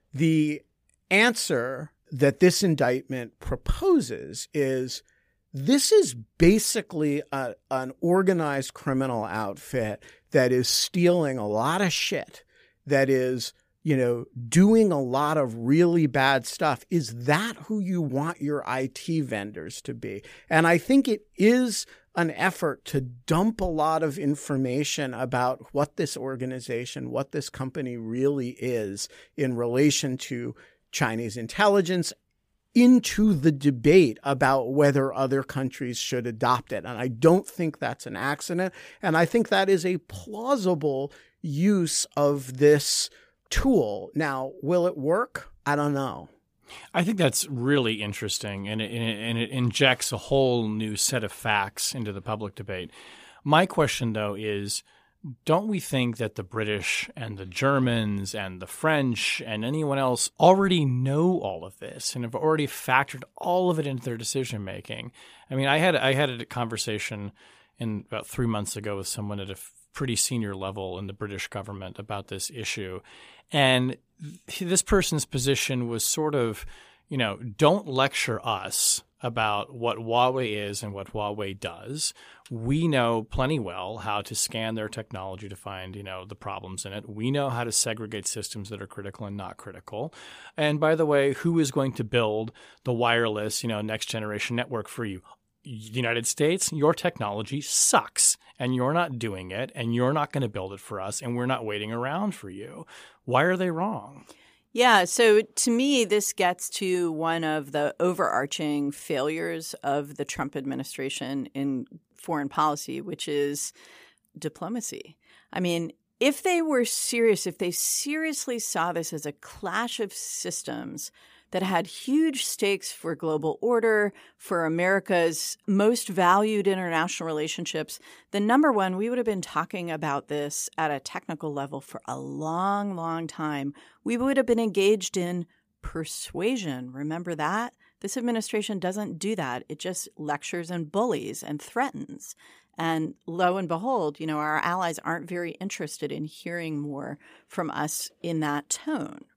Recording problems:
none

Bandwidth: 15 kHz